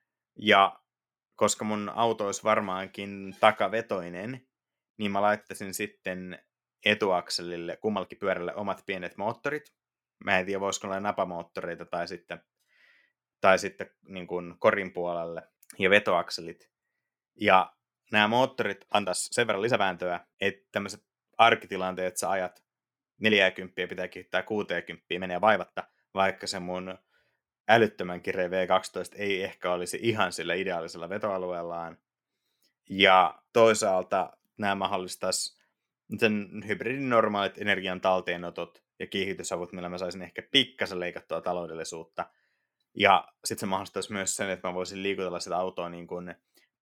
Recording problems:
uneven, jittery; strongly; from 6 to 45 s

